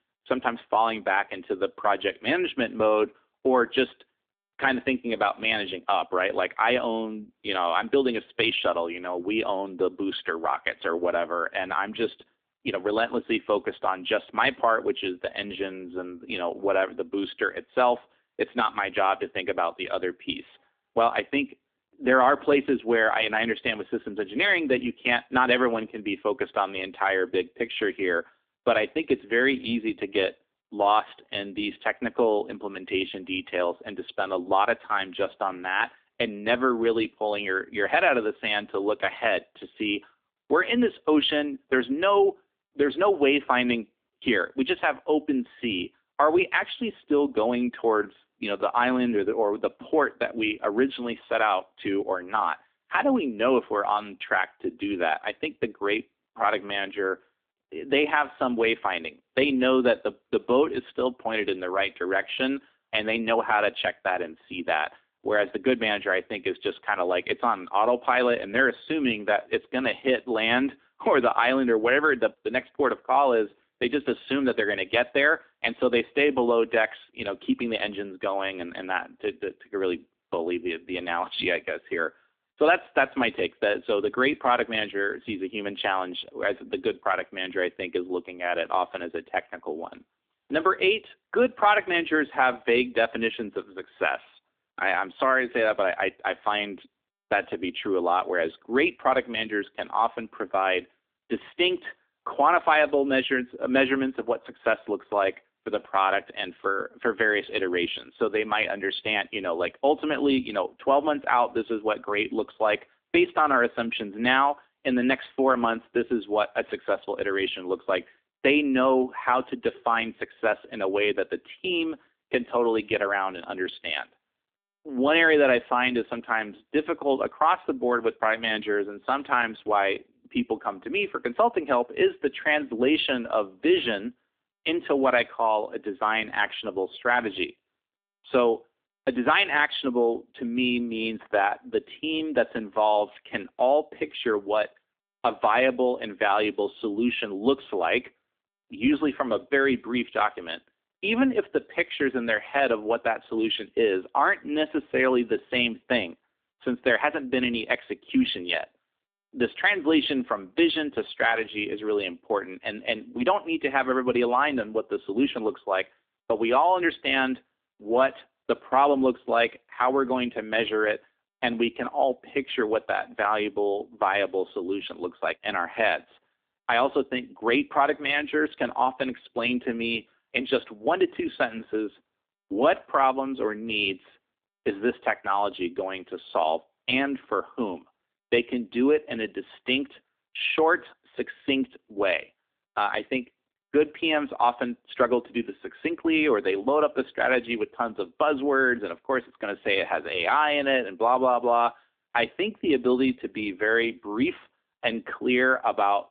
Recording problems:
phone-call audio; nothing above 3.5 kHz

